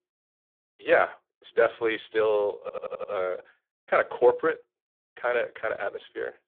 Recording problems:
phone-call audio; poor line
audio stuttering; at 2.5 s

